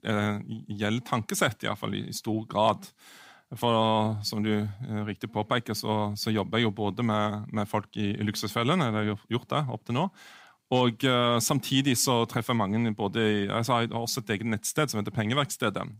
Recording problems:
none

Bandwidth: 15.5 kHz